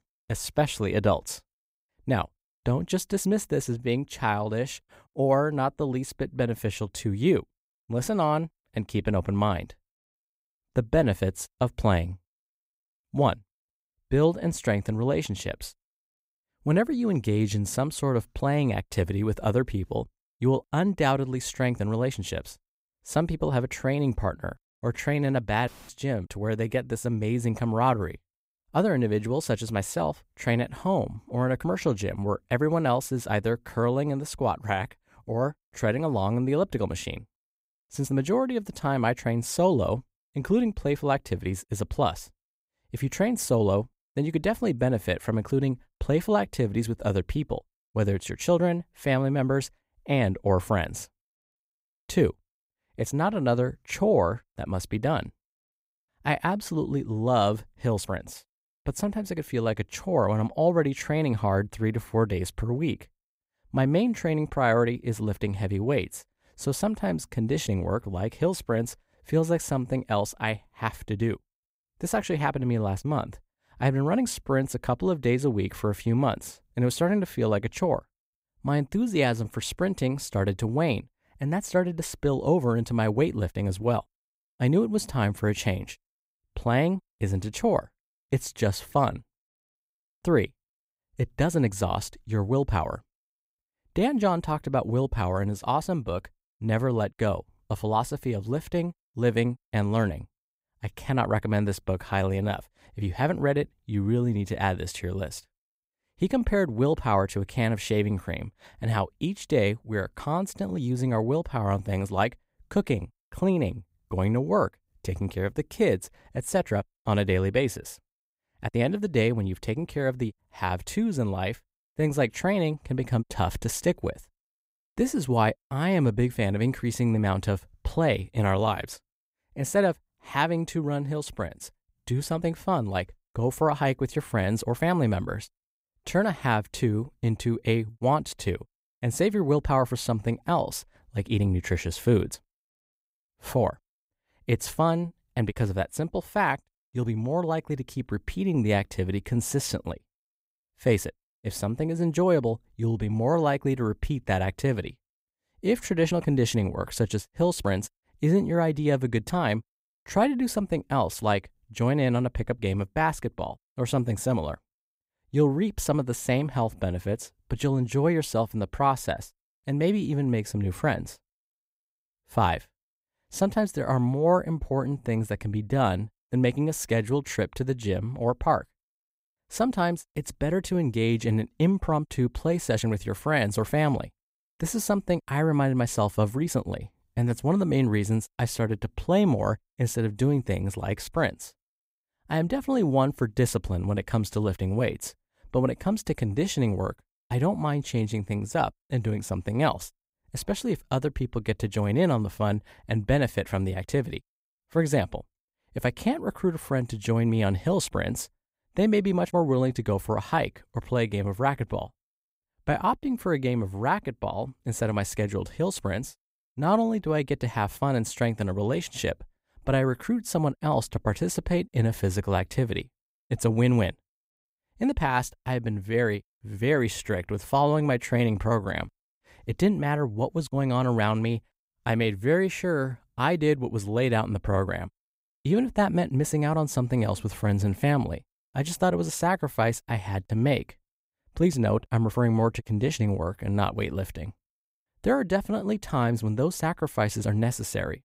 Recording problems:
none

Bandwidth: 15.5 kHz